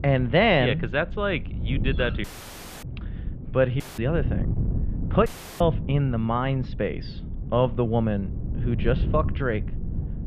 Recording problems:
muffled; very; fading above 3.5 kHz
wind noise on the microphone; occasional gusts; 15 dB below the speech
audio cutting out; filled with static; at 2 s for 0.5 s, at 4 s and at 5.5 s

